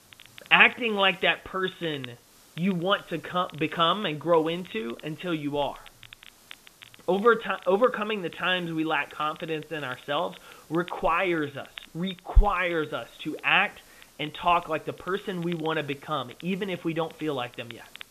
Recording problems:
high frequencies cut off; severe; nothing above 4 kHz
hiss; faint; throughout; 30 dB below the speech
crackle, like an old record; faint; 25 dB below the speech

